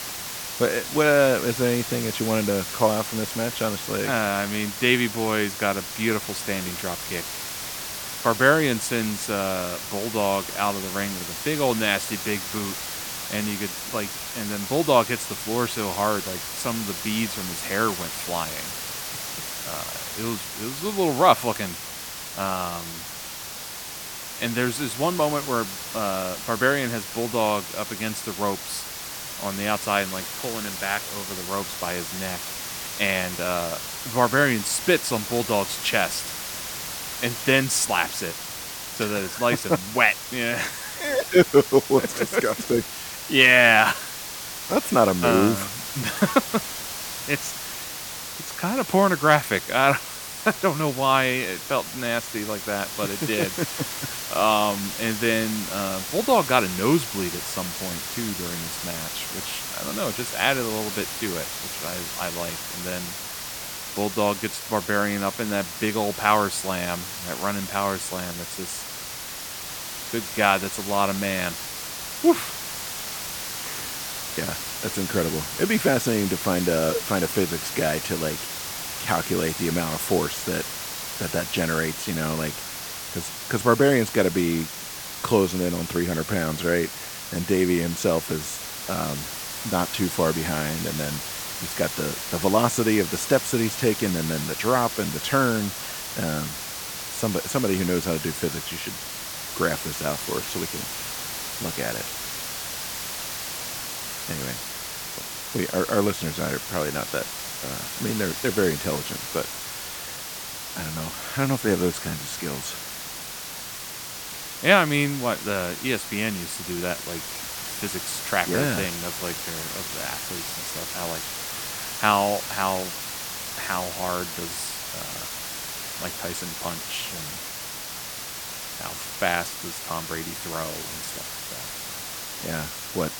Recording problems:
hiss; loud; throughout; 6 dB below the speech

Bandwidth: 18 kHz